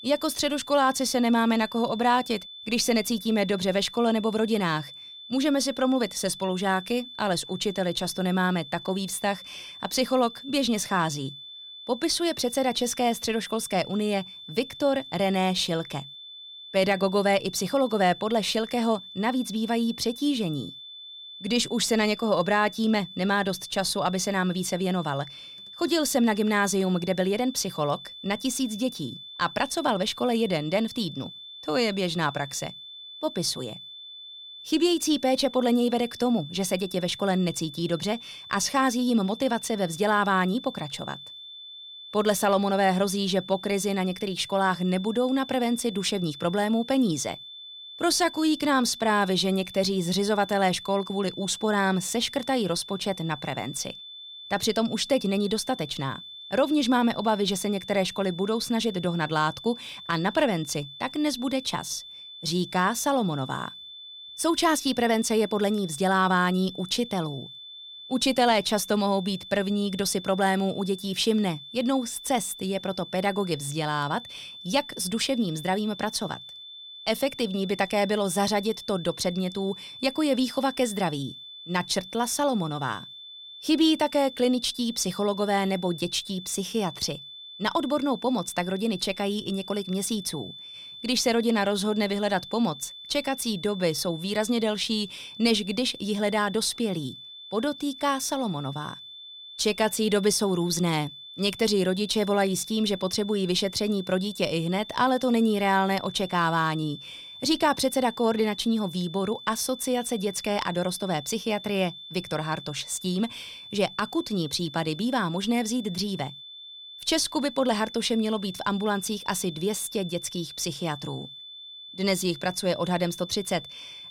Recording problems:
high-pitched whine; noticeable; throughout; 3.5 kHz, 15 dB below the speech

